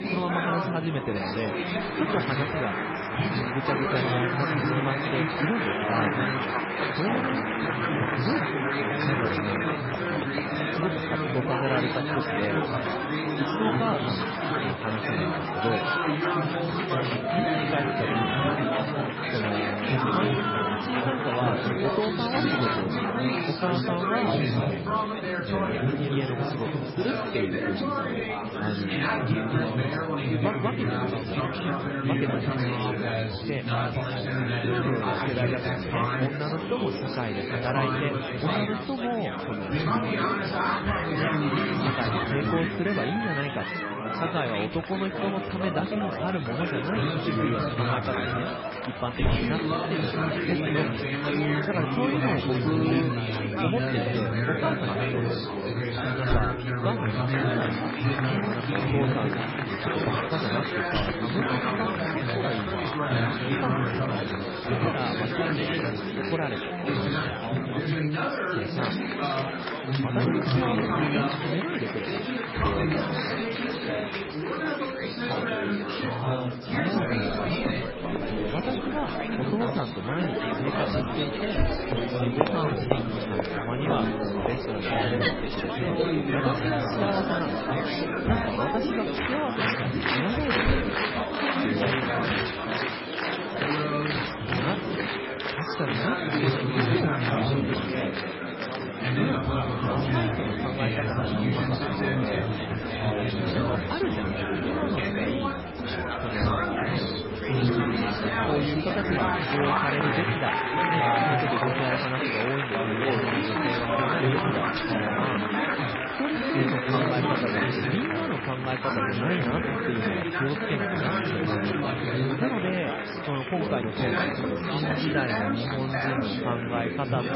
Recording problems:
garbled, watery; badly; nothing above 5.5 kHz
chatter from many people; very loud; throughout; 5 dB above the speech

